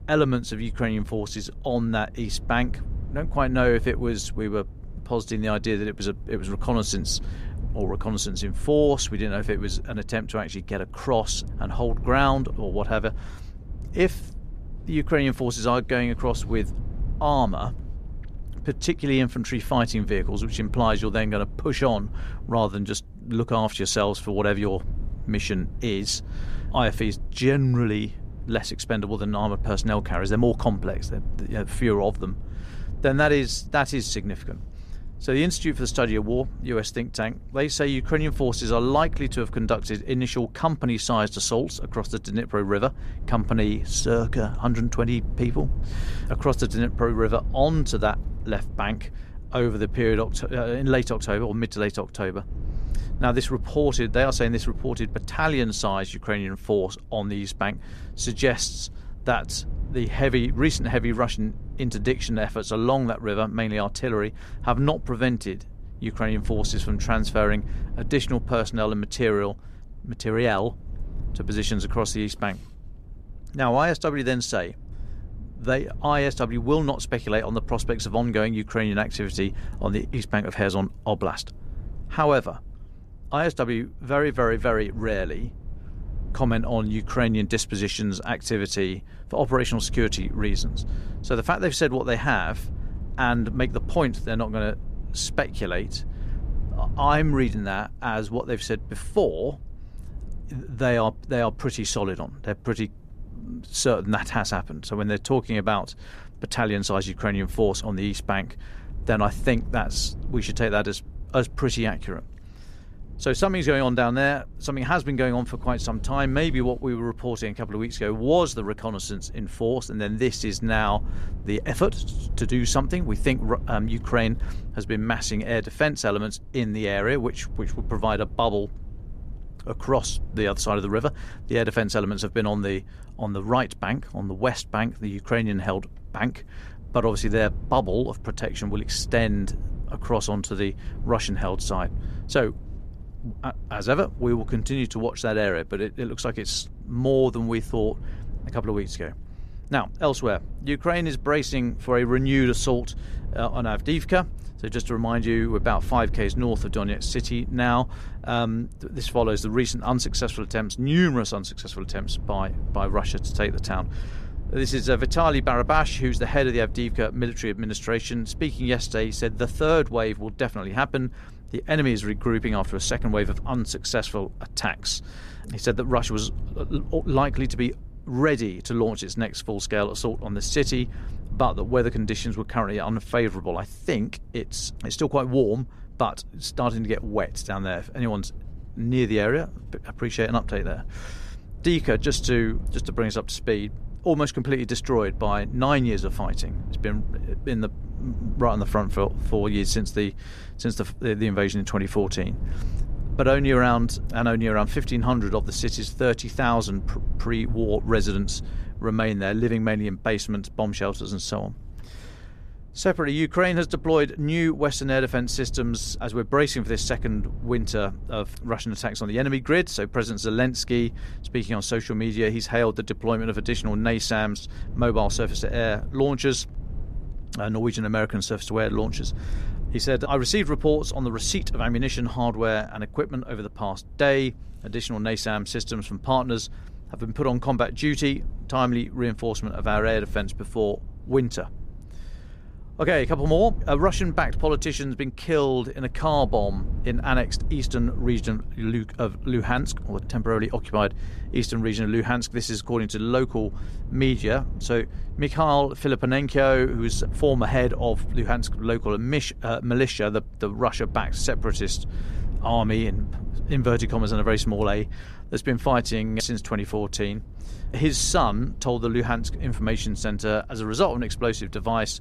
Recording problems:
low rumble; faint; throughout; 25 dB below the speech

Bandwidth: 14.5 kHz